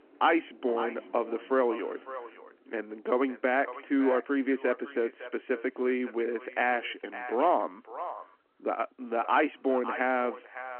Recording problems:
echo of what is said; noticeable; throughout; 560 ms later, 15 dB below the speech
phone-call audio
traffic noise; faint; throughout; 20 dB below the speech

